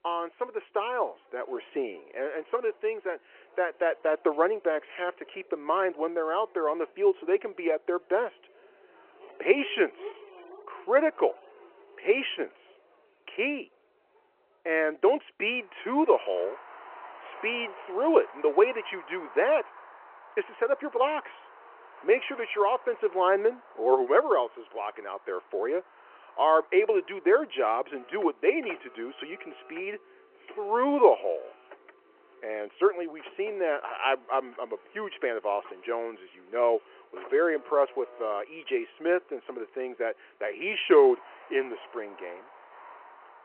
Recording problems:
phone-call audio
traffic noise; faint; throughout; 20 dB below the speech

